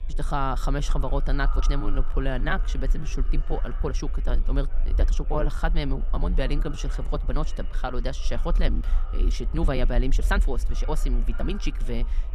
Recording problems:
echo of what is said; noticeable; throughout; 500 ms later, 20 dB below the speech
chatter from many people; faint; throughout; 25 dB below the speech
low rumble; faint; throughout; 20 dB below the speech
uneven, jittery; strongly; from 1.5 to 12 s

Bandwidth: 14.5 kHz